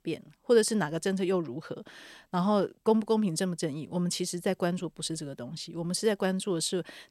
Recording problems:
none

